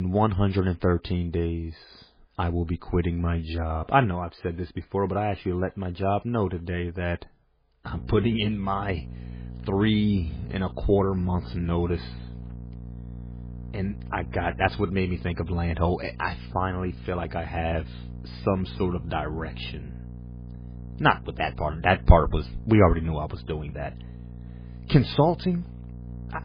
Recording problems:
garbled, watery; badly; nothing above 5 kHz
electrical hum; faint; from 8 s on; 60 Hz, 20 dB below the speech
abrupt cut into speech; at the start

